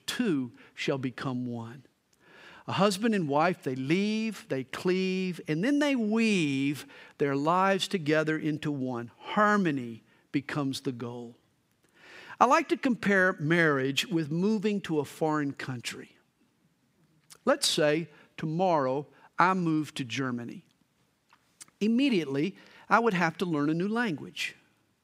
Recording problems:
none

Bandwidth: 15.5 kHz